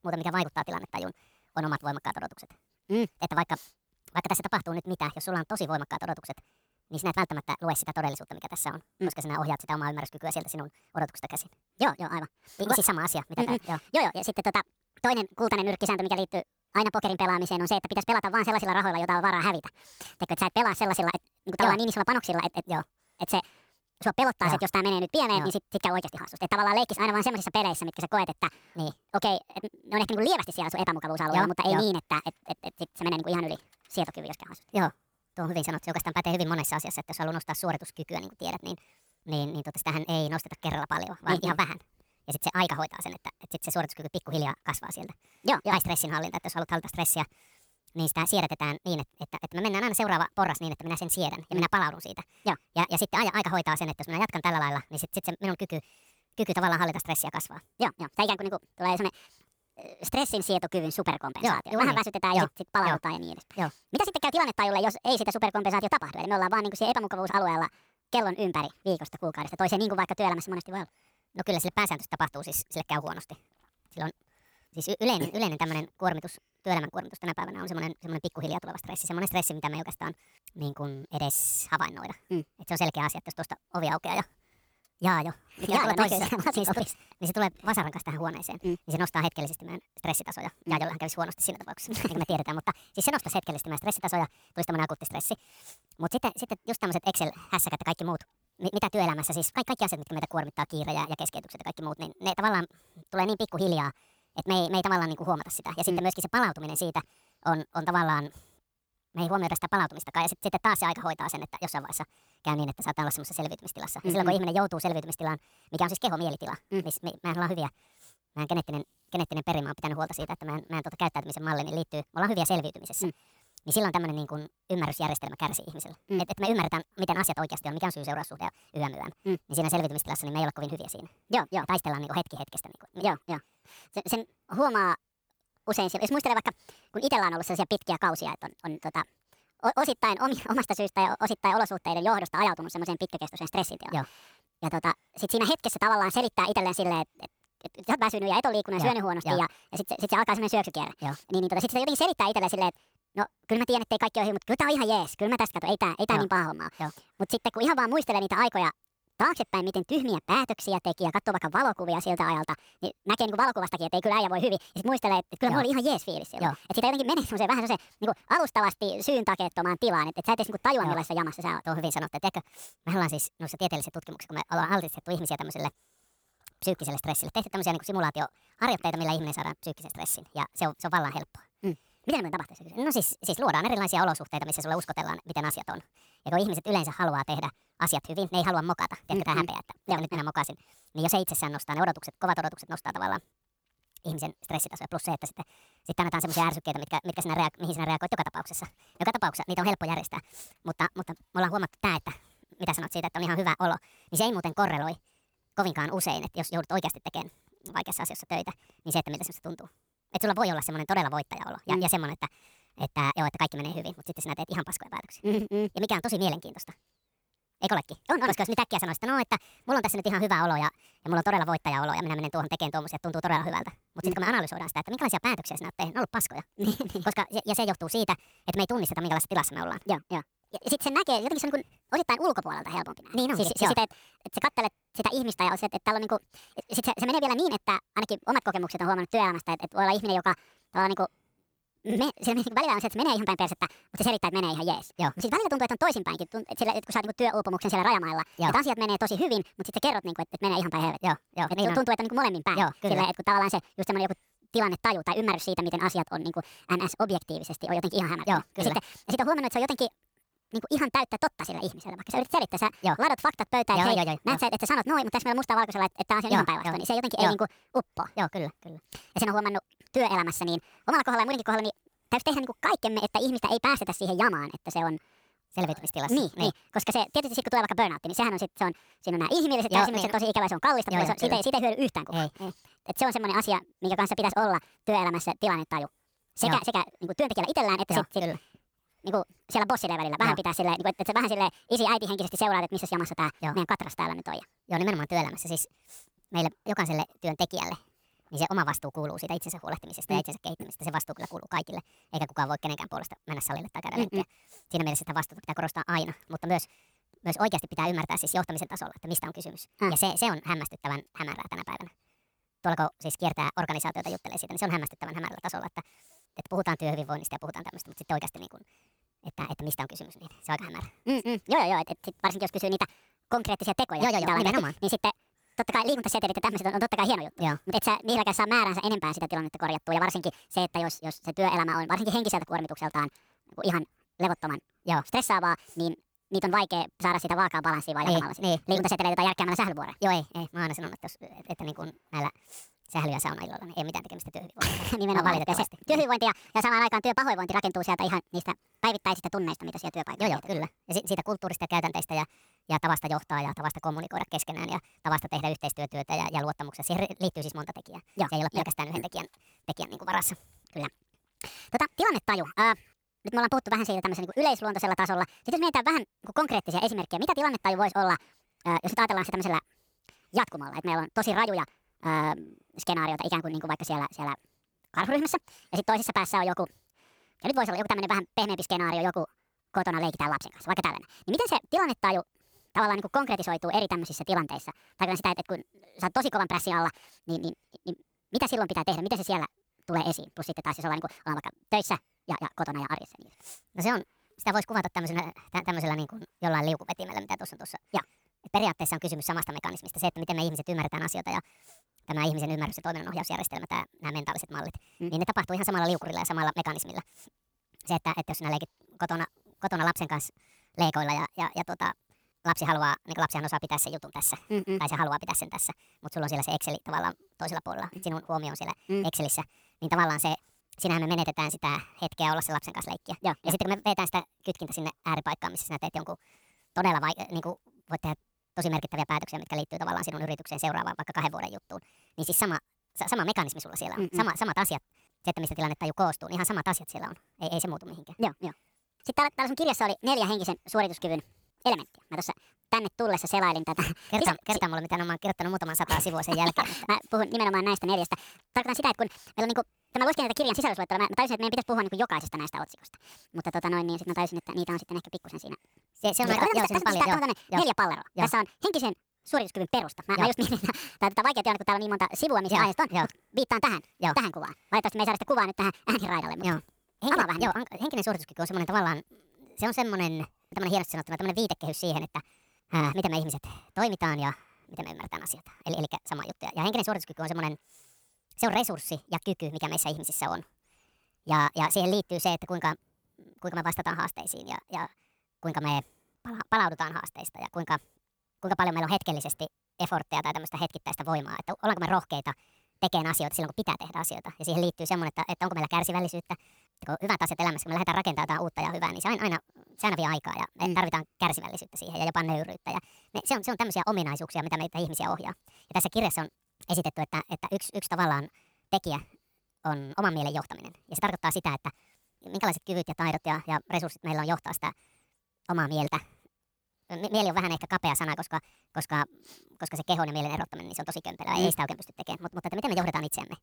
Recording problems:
wrong speed and pitch; too fast and too high; 1.6 times normal speed

